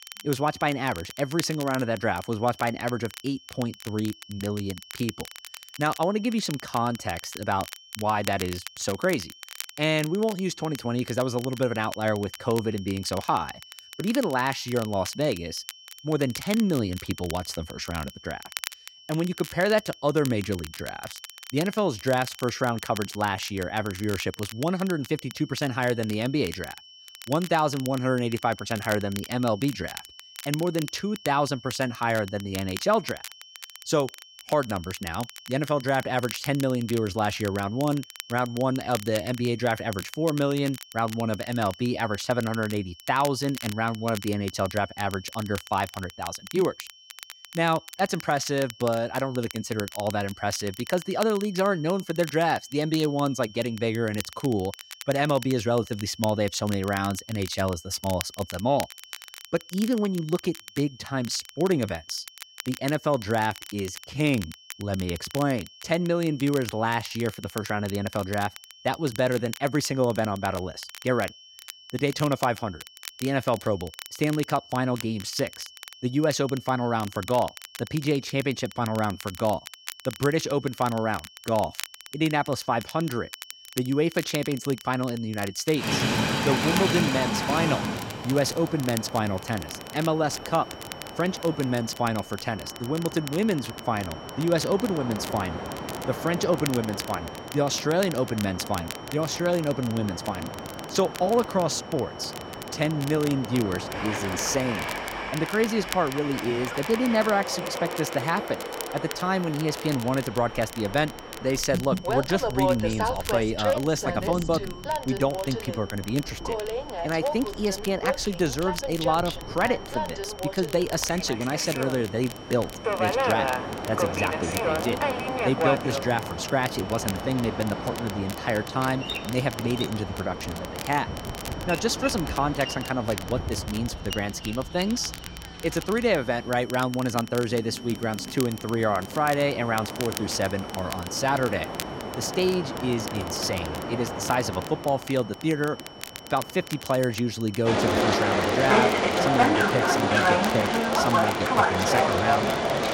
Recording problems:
train or aircraft noise; loud; from 1:26 on; 2 dB below the speech
crackle, like an old record; noticeable; 15 dB below the speech
high-pitched whine; faint; throughout; 3 kHz, 20 dB below the speech

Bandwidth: 16 kHz